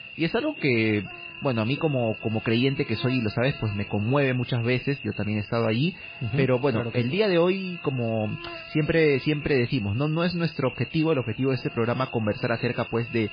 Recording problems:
garbled, watery; badly; nothing above 4.5 kHz
electrical hum; loud; throughout; 50 Hz, 10 dB below the speech

